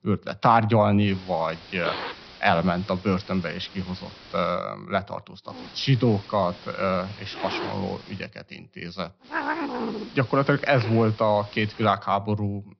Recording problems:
high frequencies cut off; noticeable; nothing above 5.5 kHz
hiss; noticeable; from 1 to 4.5 s, from 5.5 to 8 s and from 9.5 to 12 s; 10 dB below the speech

